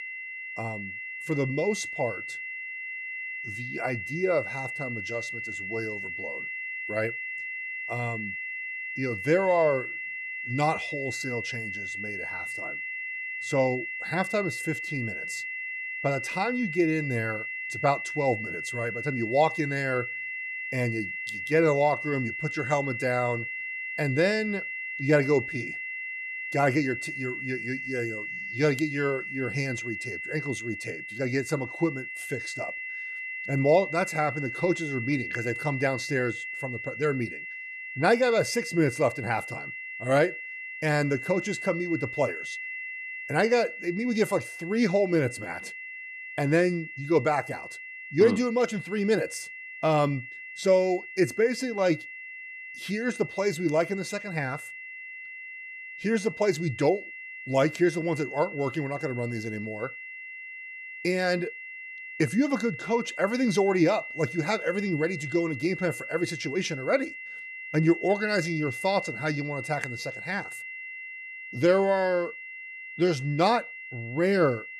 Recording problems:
high-pitched whine; loud; throughout; 2 kHz, 7 dB below the speech

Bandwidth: 13.5 kHz